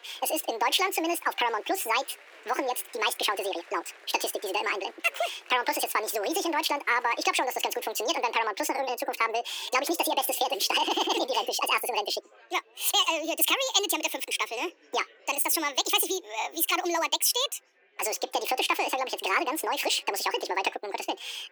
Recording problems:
thin; very; fading below 350 Hz
wrong speed and pitch; too fast and too high; 1.8 times normal speed
chatter from many people; faint; throughout; 25 dB below the speech

